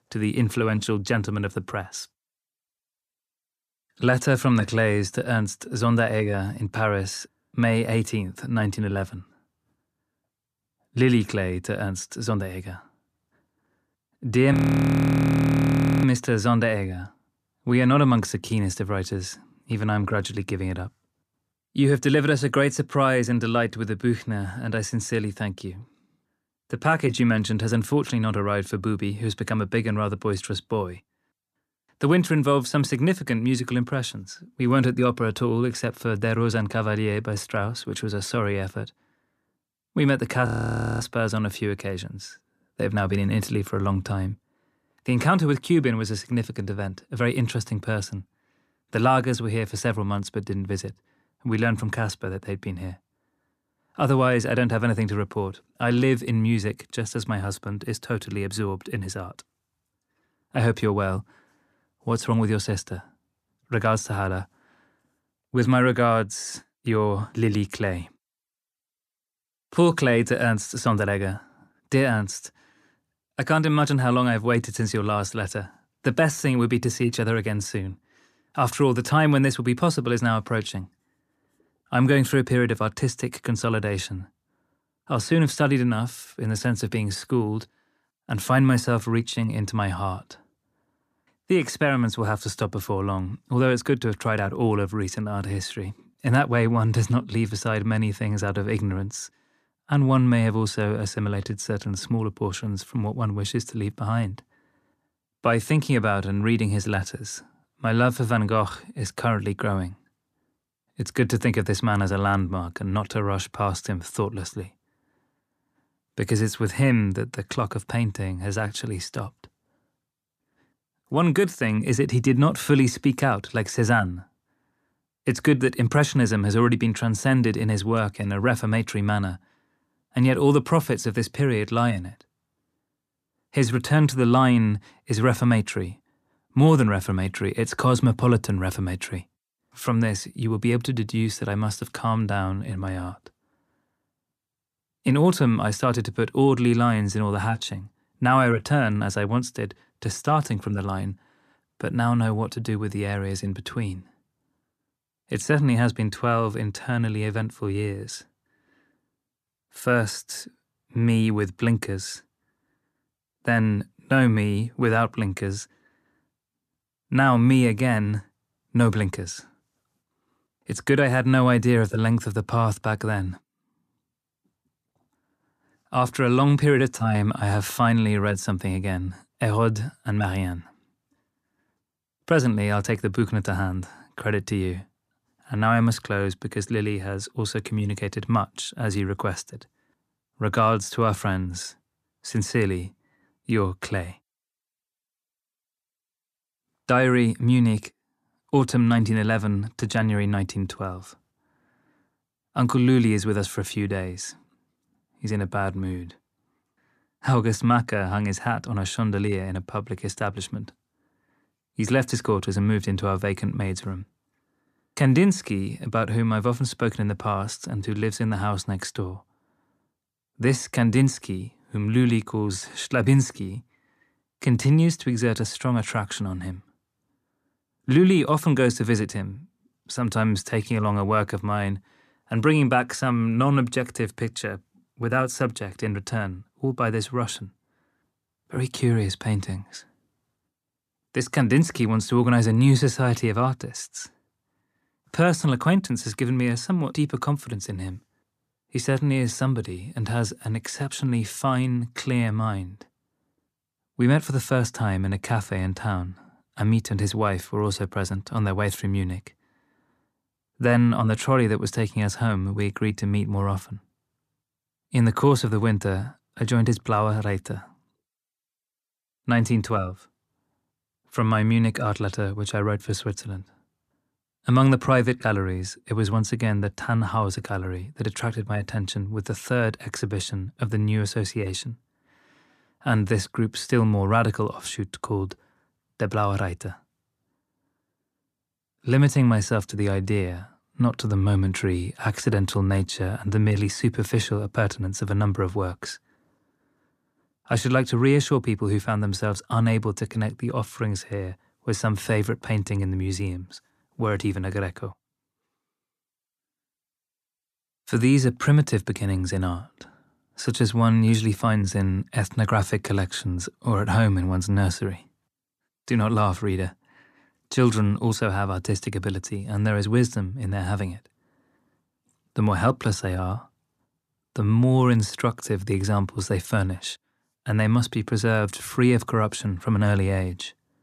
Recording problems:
audio freezing; at 15 s for 1.5 s and at 40 s for 0.5 s

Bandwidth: 14.5 kHz